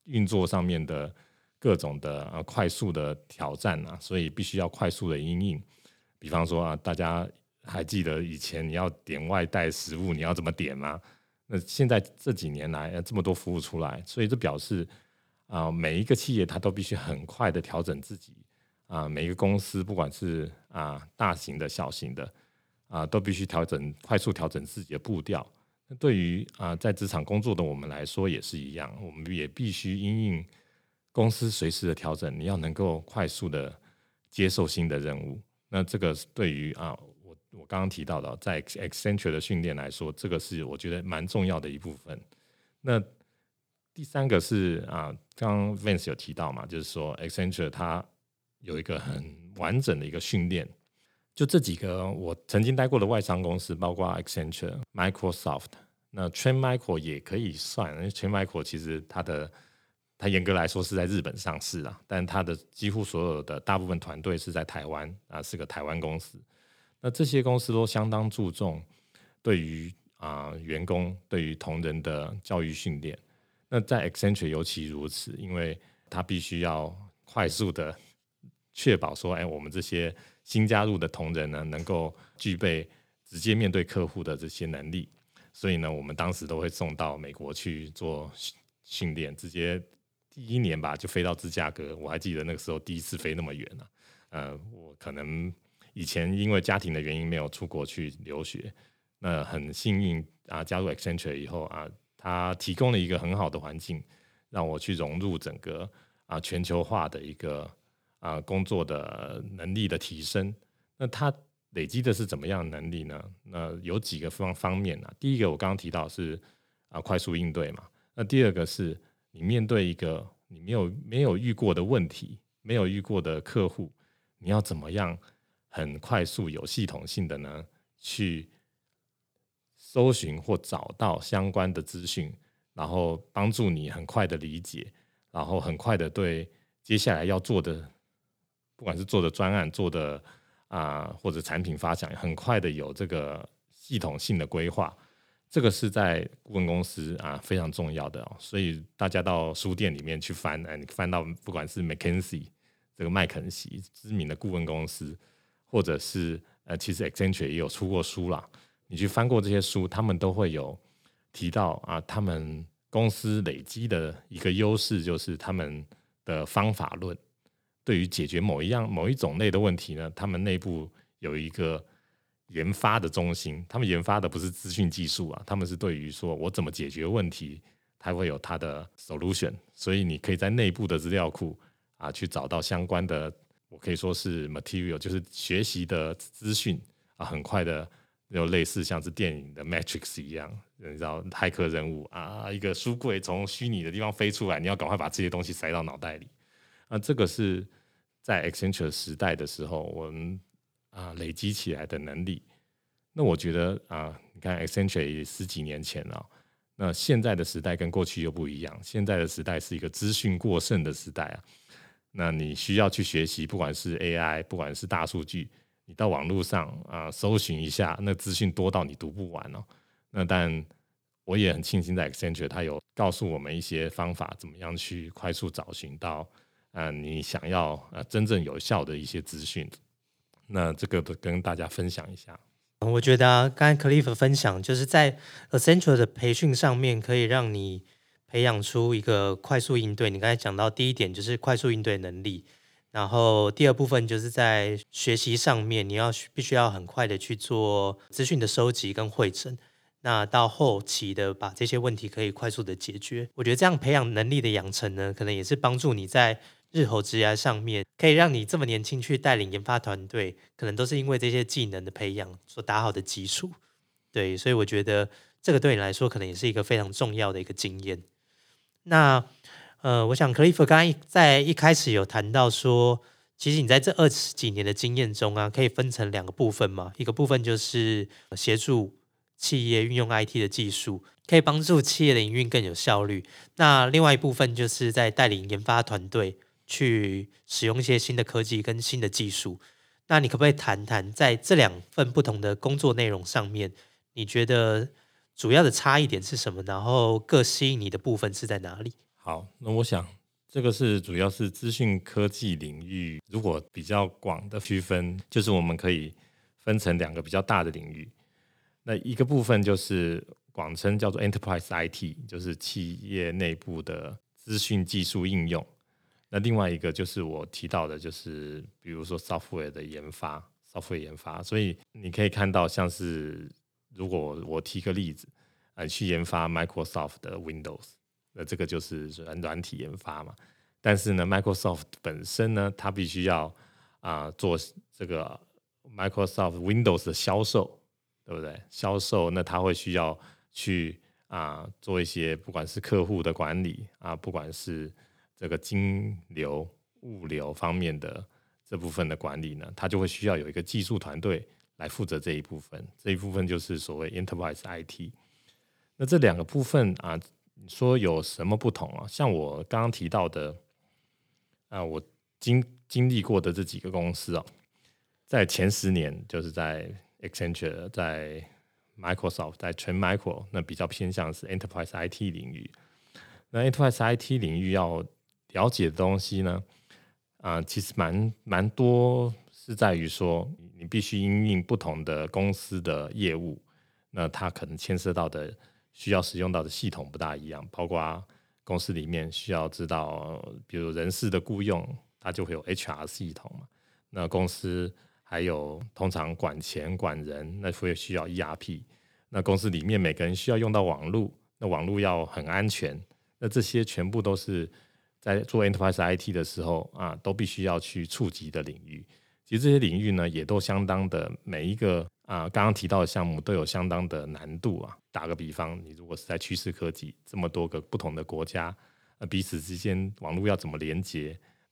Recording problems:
none

